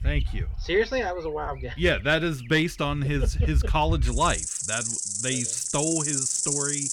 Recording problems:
animal sounds; very loud; throughout; as loud as the speech

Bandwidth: 18 kHz